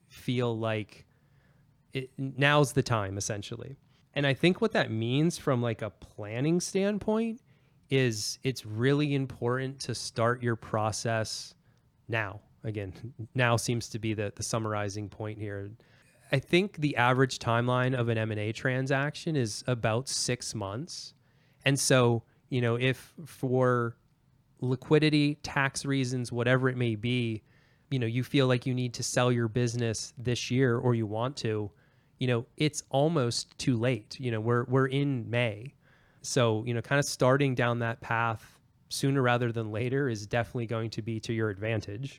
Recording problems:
none

